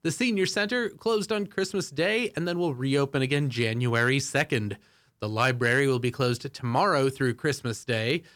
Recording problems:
none

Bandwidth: 18.5 kHz